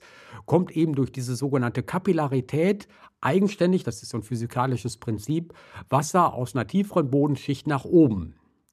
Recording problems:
none

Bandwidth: 14.5 kHz